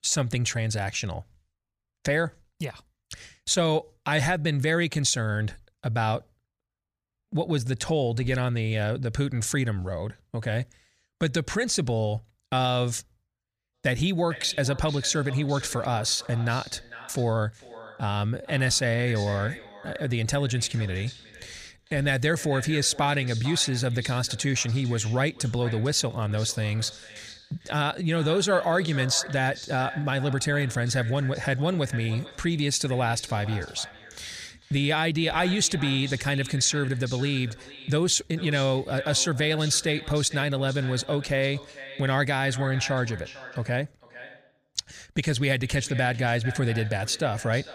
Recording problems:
echo of what is said; noticeable; from 14 s on; 450 ms later, 15 dB below the speech

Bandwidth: 15 kHz